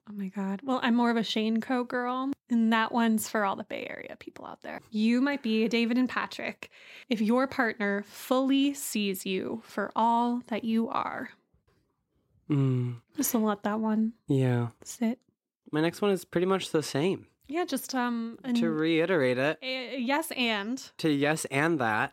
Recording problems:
none

